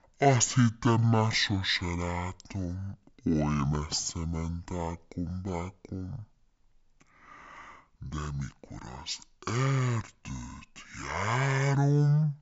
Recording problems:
wrong speed and pitch; too slow and too low; 0.6 times normal speed

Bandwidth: 7.5 kHz